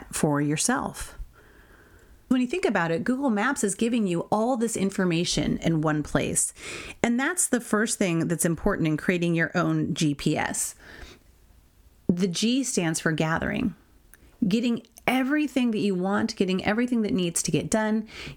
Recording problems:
squashed, flat; somewhat

